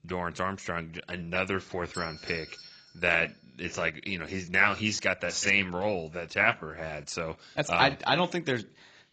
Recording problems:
garbled, watery; badly; nothing above 7.5 kHz
doorbell; faint; at 2 s; peak 10 dB below the speech

